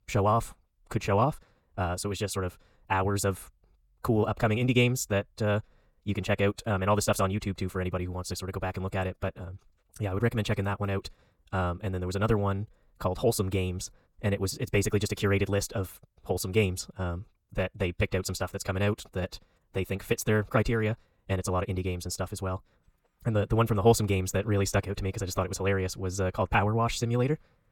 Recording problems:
wrong speed, natural pitch; too fast; 1.6 times normal speed

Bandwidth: 17.5 kHz